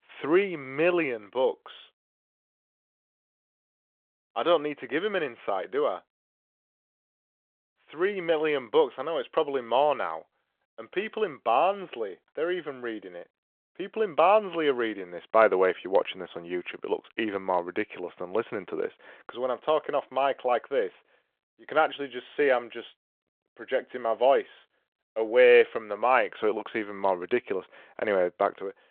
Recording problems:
phone-call audio

